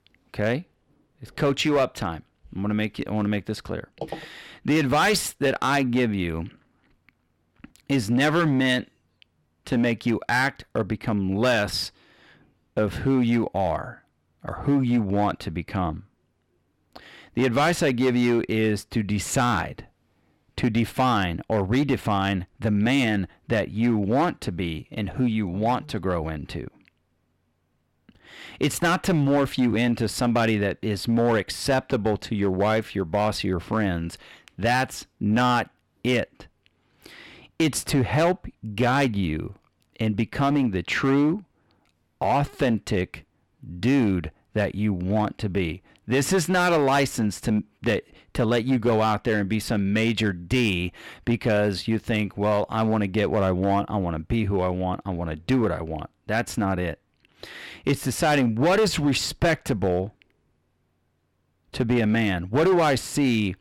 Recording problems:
distortion; slight; 6% of the sound clipped

